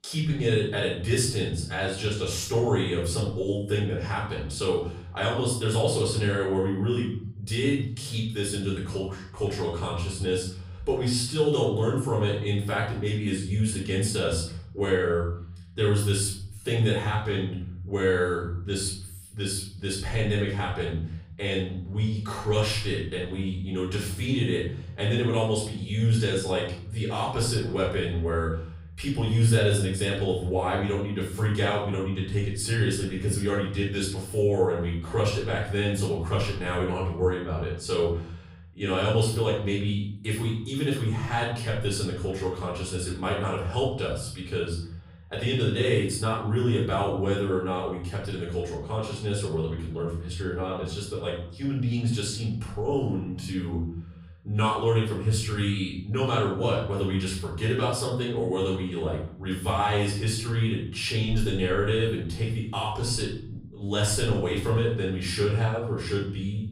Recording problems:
off-mic speech; far
room echo; noticeable; dies away in 0.8 s

